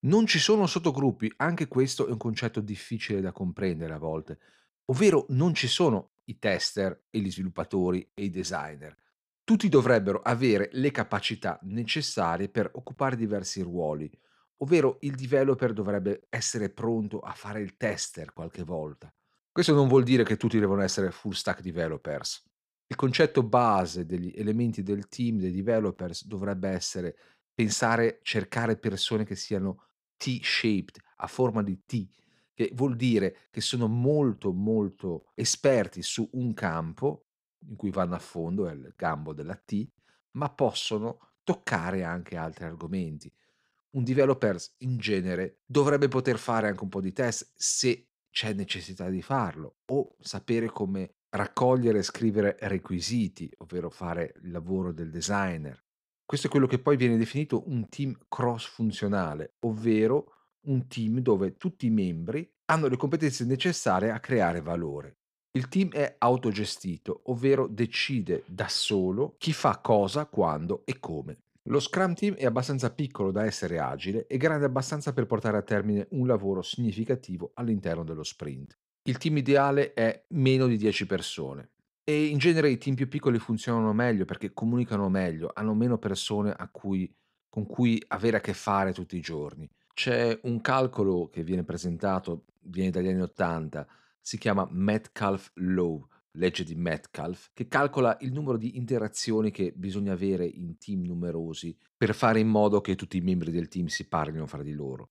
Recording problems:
none

